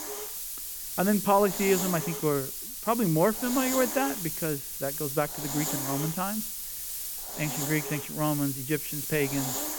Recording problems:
high frequencies cut off; severe; nothing above 3.5 kHz
hiss; loud; throughout; 3 dB below the speech

